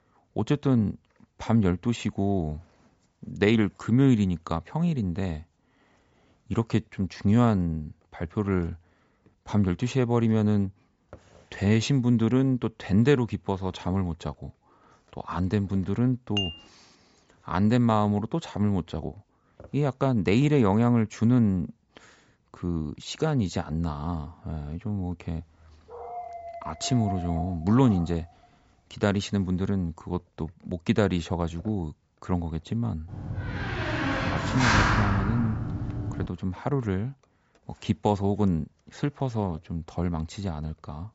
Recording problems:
high frequencies cut off; noticeable; nothing above 8 kHz
clattering dishes; noticeable; at 16 s; peak 4 dB below the speech
dog barking; noticeable; from 26 to 28 s; peak 9 dB below the speech
door banging; loud; from 33 to 36 s; peak 5 dB above the speech

